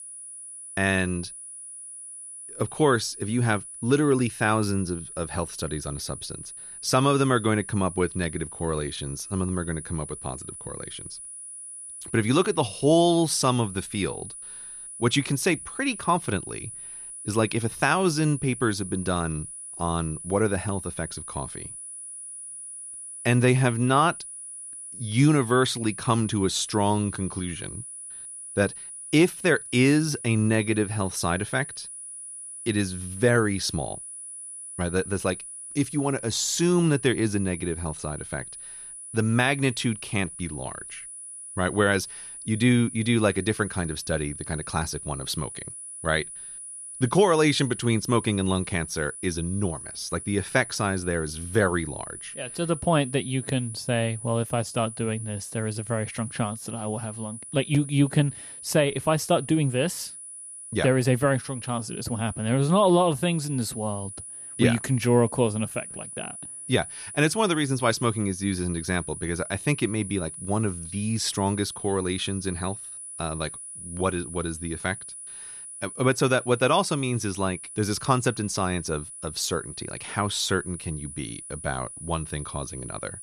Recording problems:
high-pitched whine; noticeable; throughout; 10 kHz, 10 dB below the speech

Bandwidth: 14 kHz